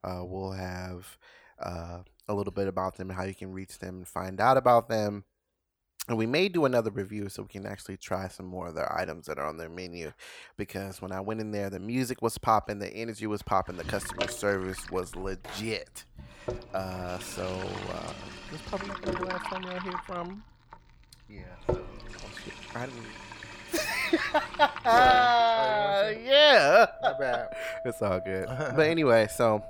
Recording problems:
household noises; noticeable; from 14 s on; 10 dB below the speech

